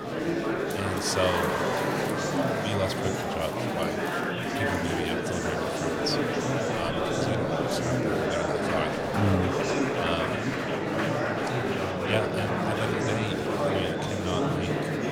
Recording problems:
murmuring crowd; very loud; throughout; 5 dB above the speech

